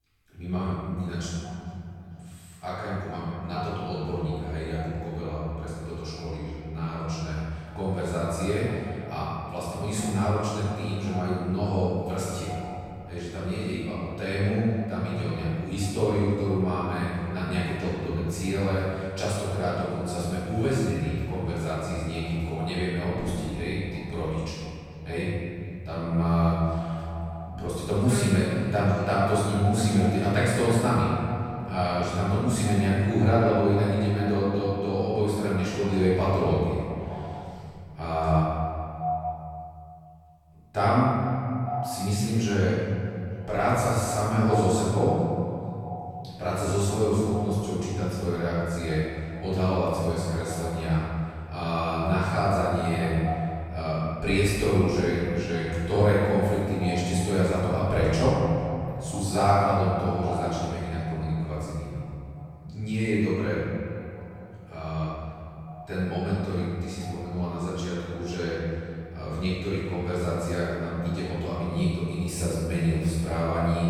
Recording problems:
room echo; strong; dies away in 2.6 s
off-mic speech; far
echo of what is said; noticeable; throughout; 450 ms later, 15 dB below the speech

